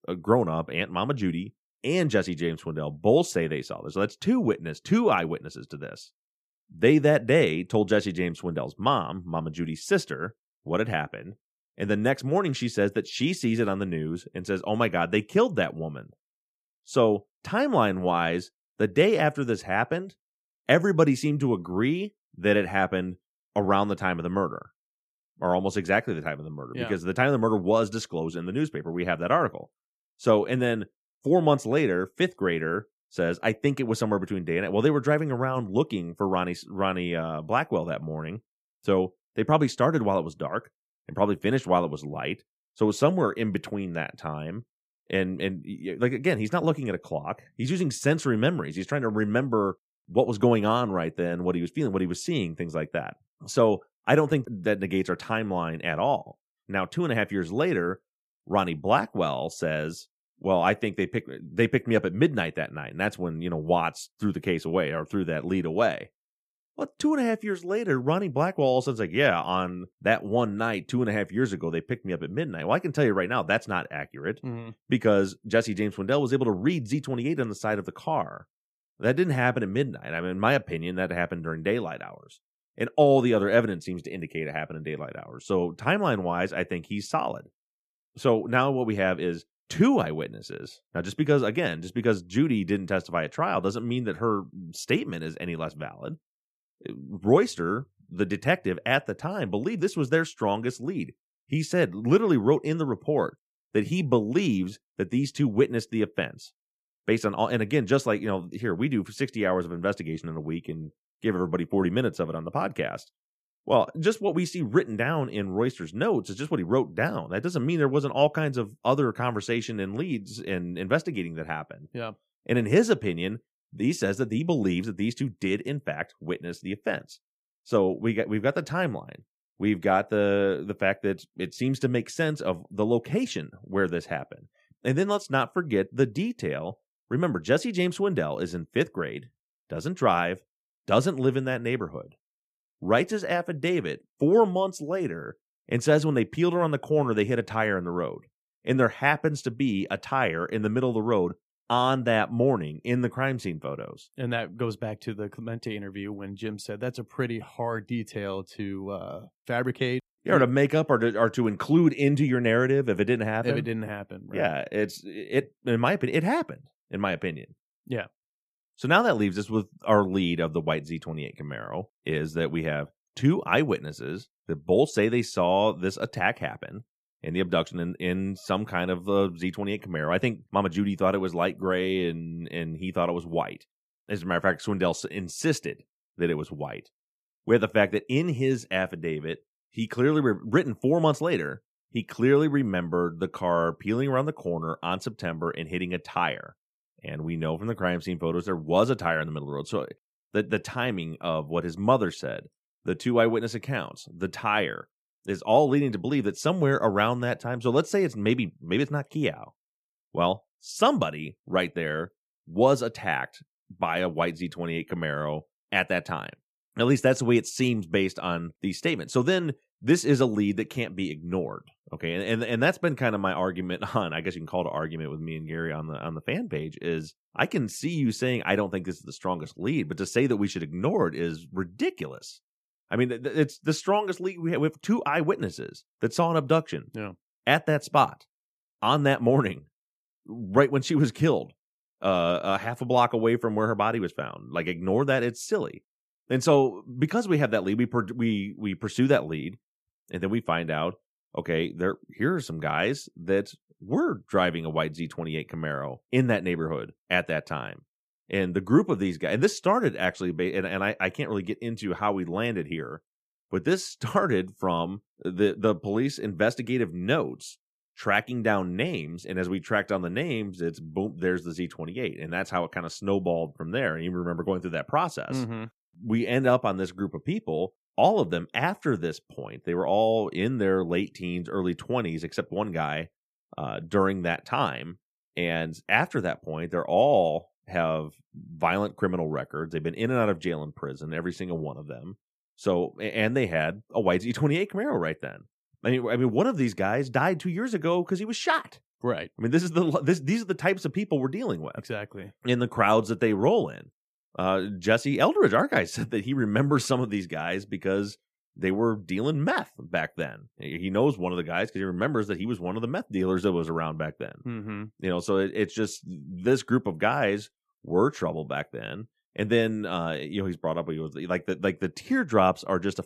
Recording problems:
none

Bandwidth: 14.5 kHz